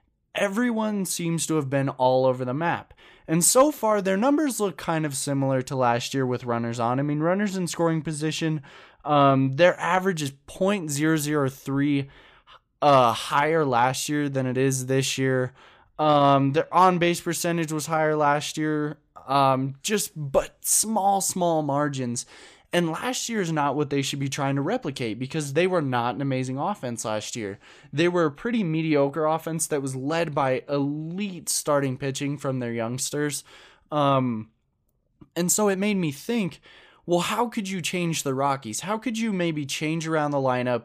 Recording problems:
uneven, jittery; strongly; from 9 to 36 s

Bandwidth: 15 kHz